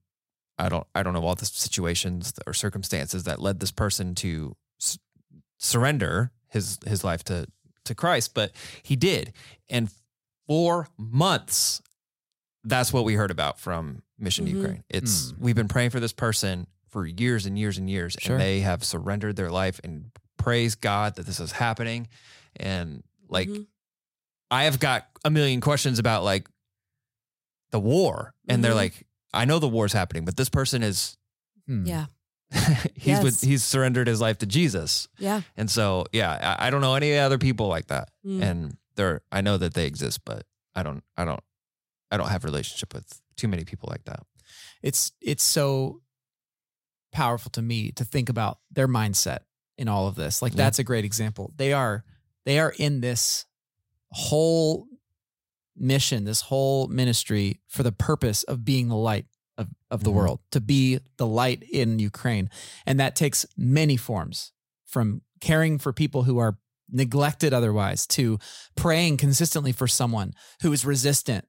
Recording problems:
none

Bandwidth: 16 kHz